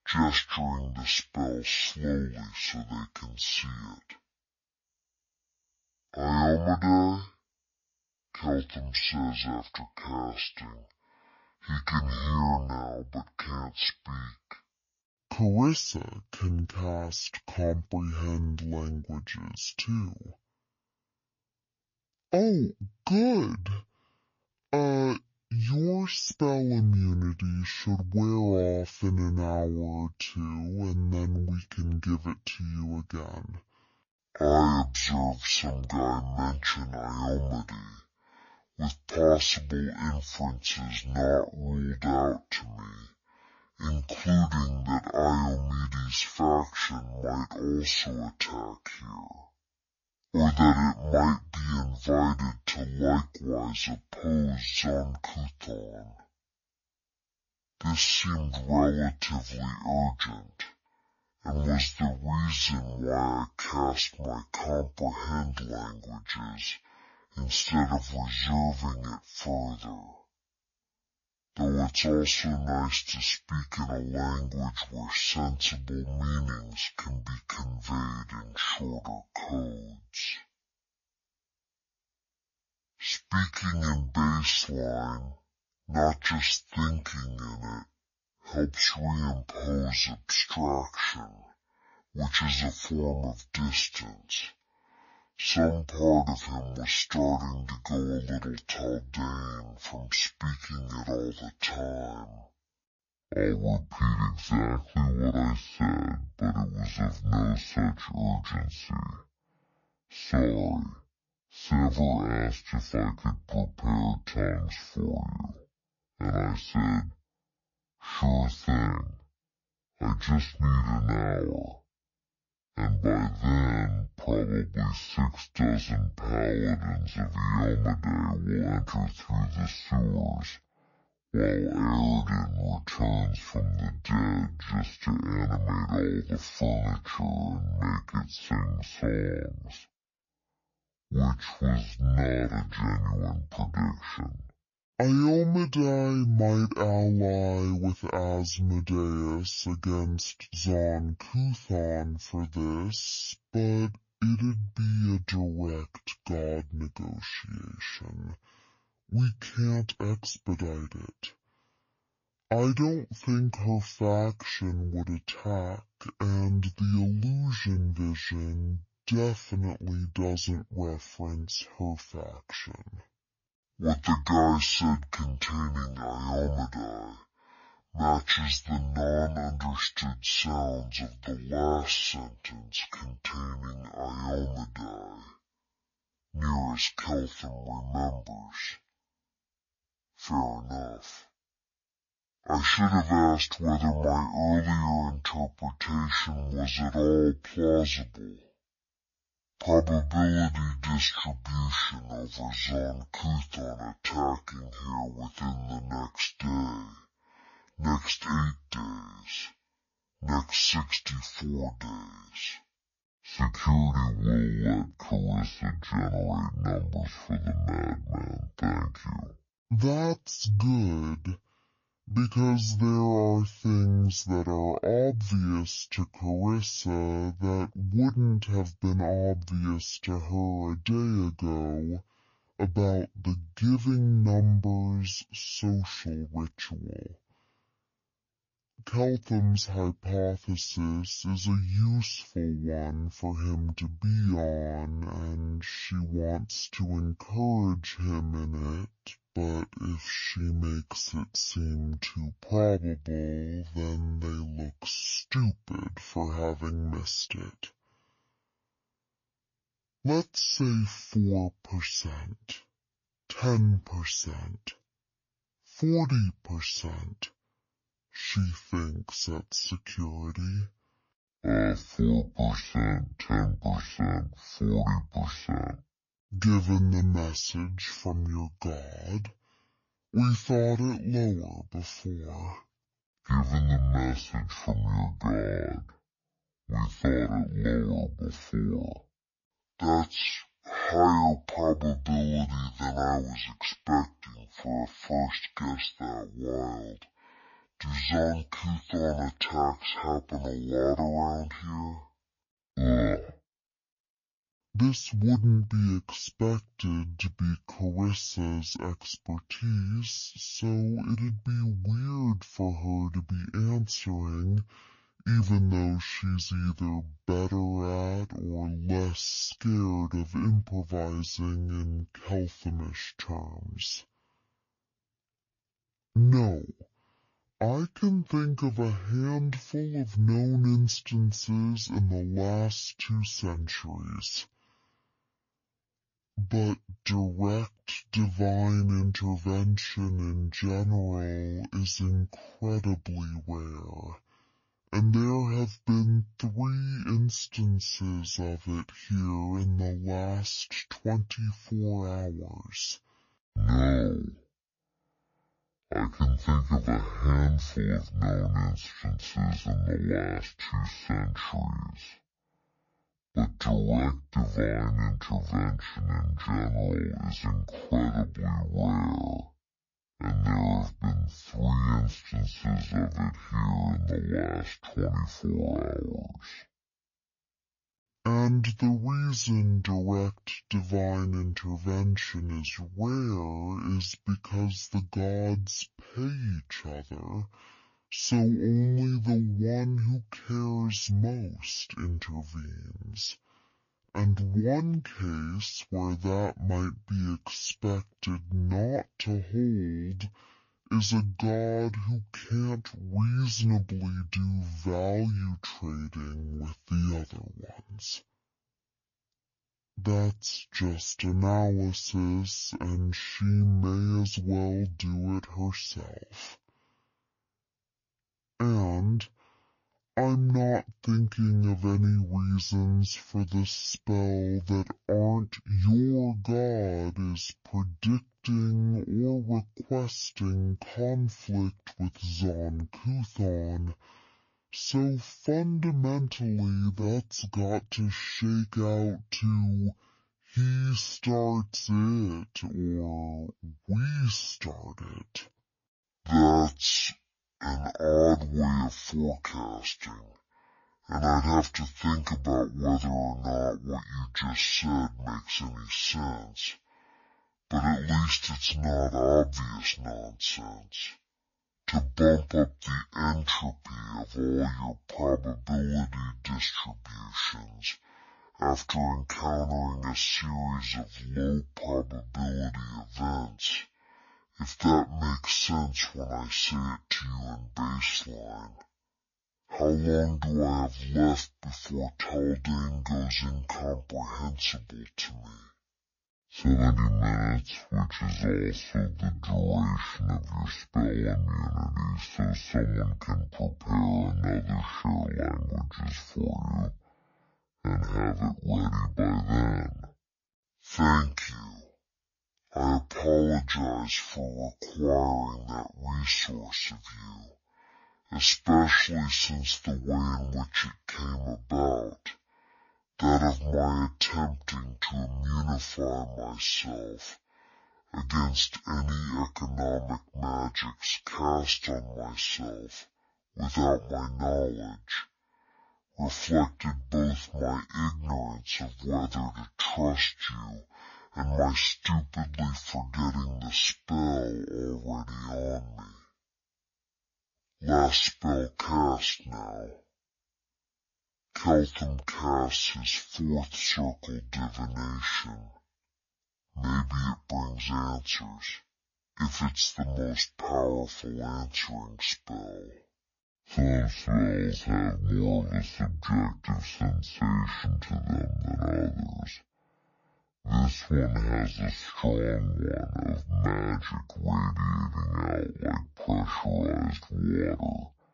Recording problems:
wrong speed and pitch; too slow and too low; 0.5 times normal speed

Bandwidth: 7 kHz